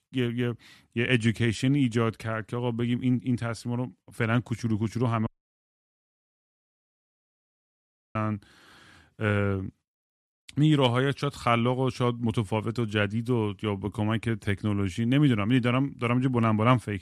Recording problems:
audio cutting out; at 5.5 s for 3 s

